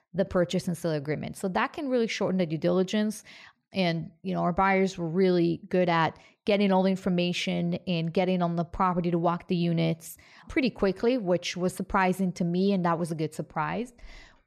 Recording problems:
none

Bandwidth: 14.5 kHz